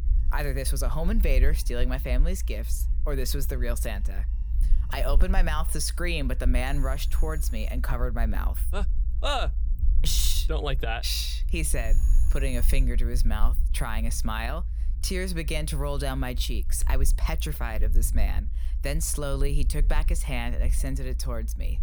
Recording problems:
alarms or sirens; noticeable; until 14 s; 20 dB below the speech
low rumble; noticeable; throughout; 20 dB below the speech

